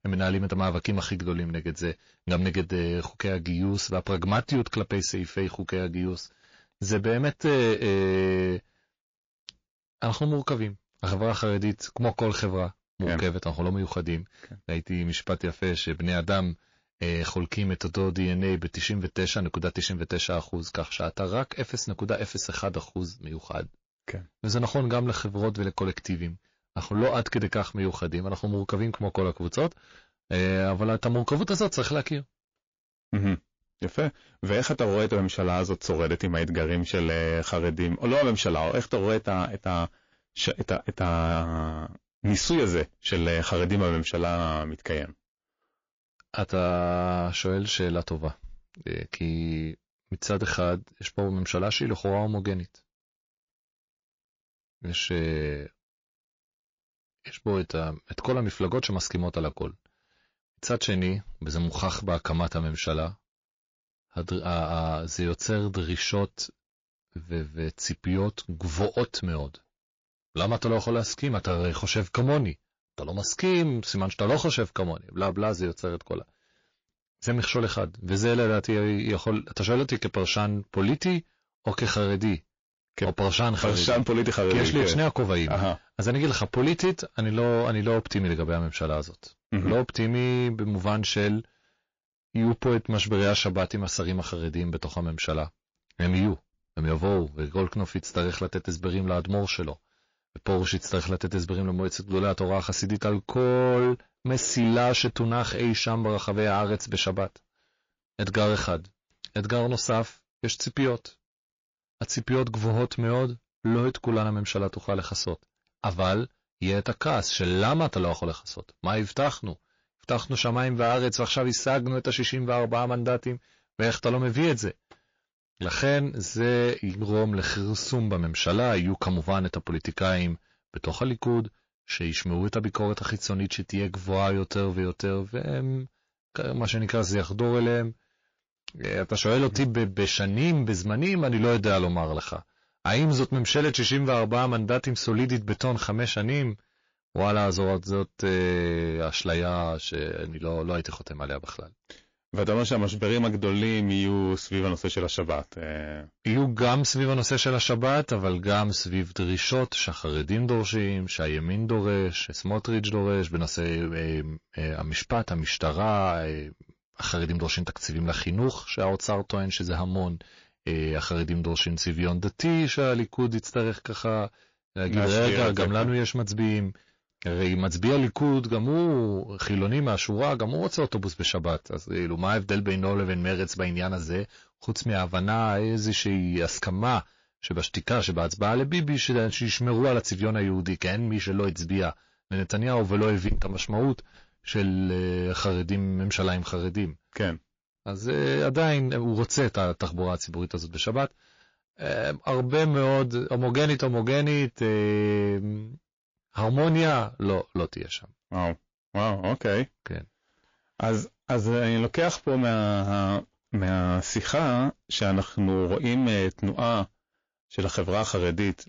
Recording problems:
distortion; slight; 10 dB below the speech
garbled, watery; slightly; nothing above 6 kHz

